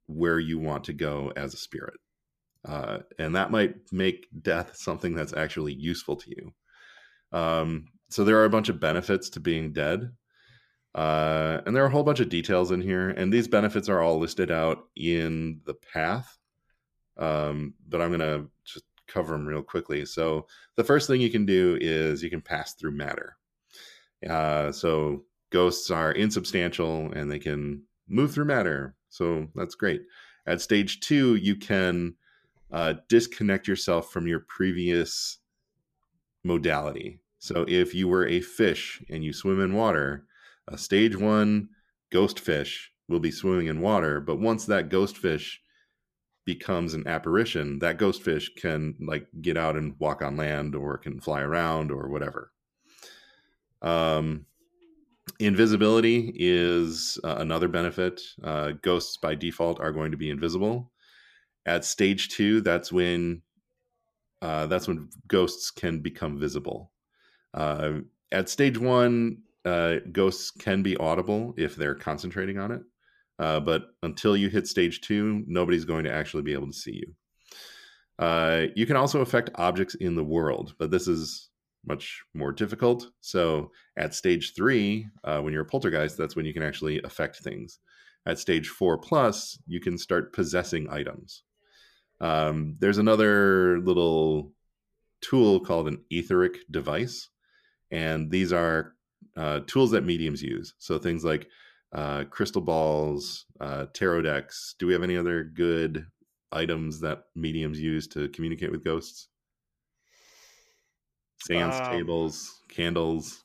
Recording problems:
none

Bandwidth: 14.5 kHz